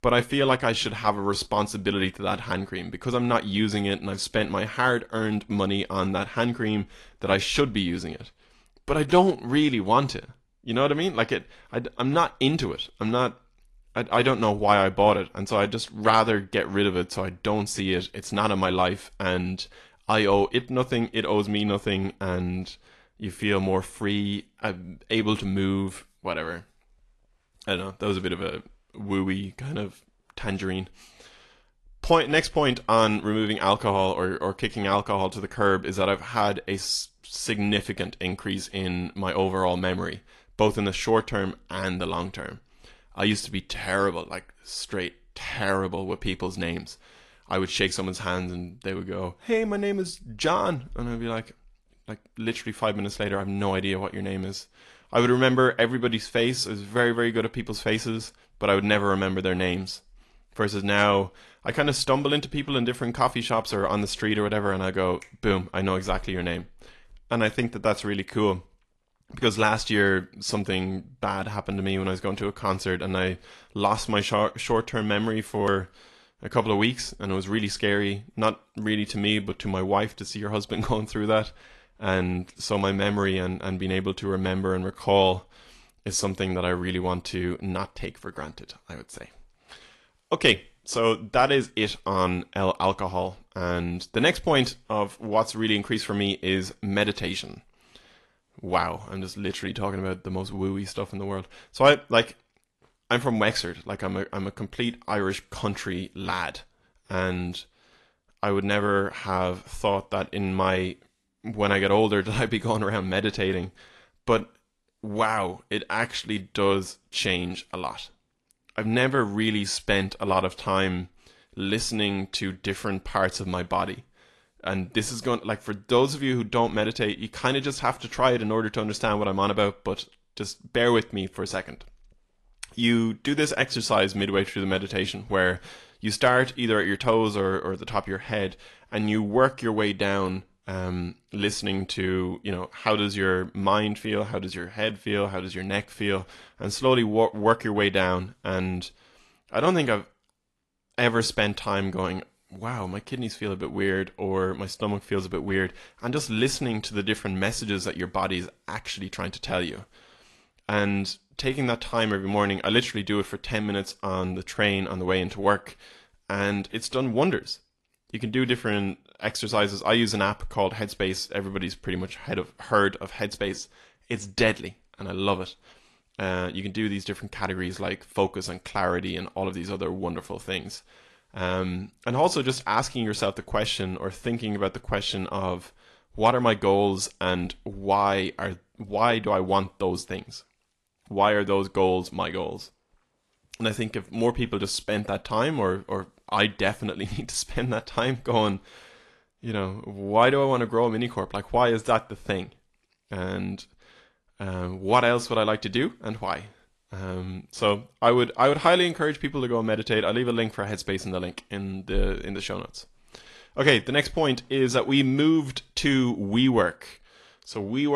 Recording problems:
garbled, watery; slightly; nothing above 11 kHz
abrupt cut into speech; at the end

